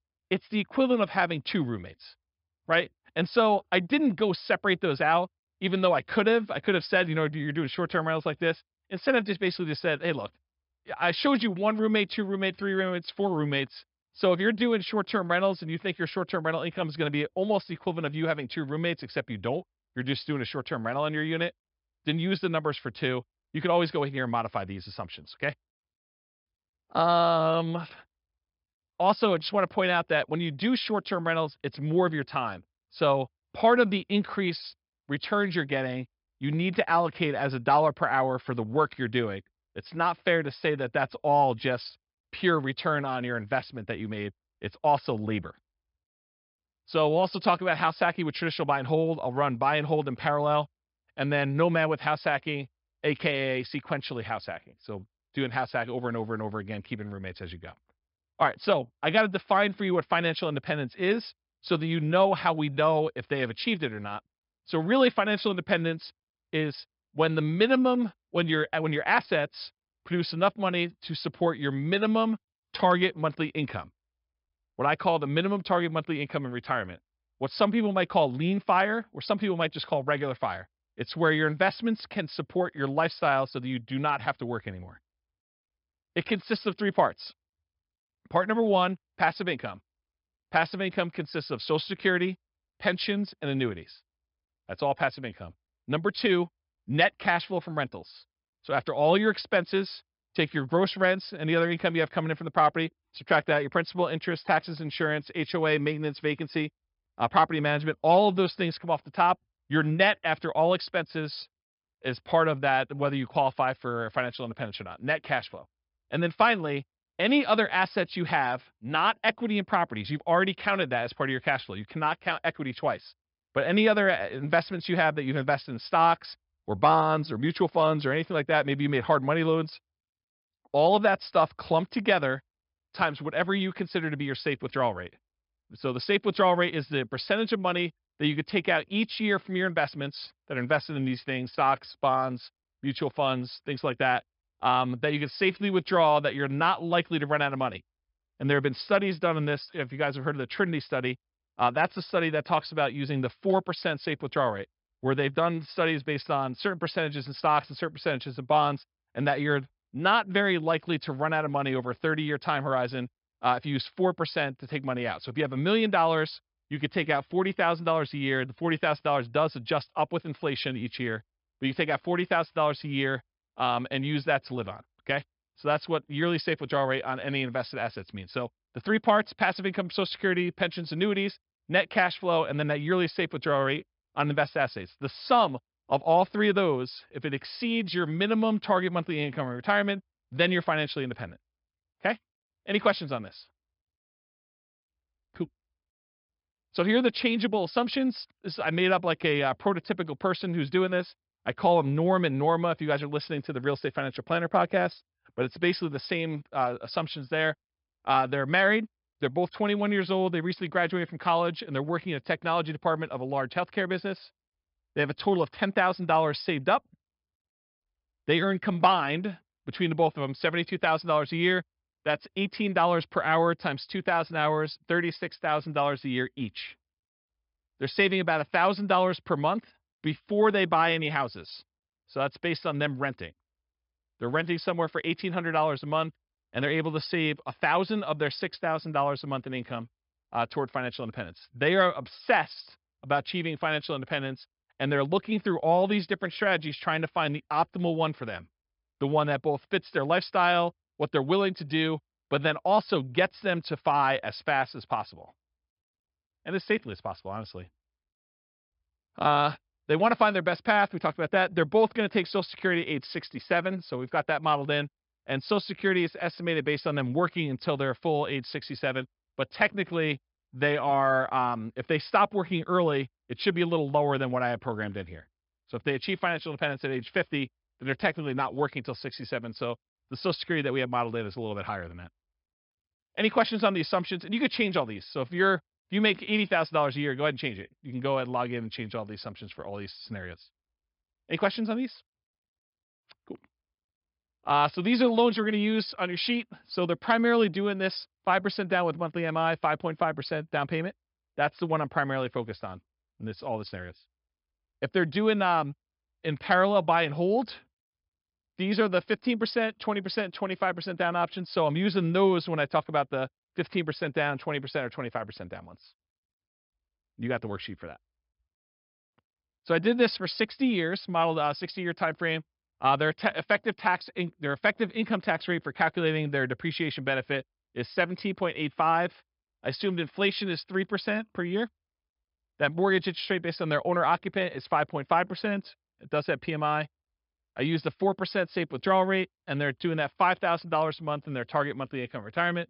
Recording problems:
high frequencies cut off; noticeable; nothing above 5.5 kHz

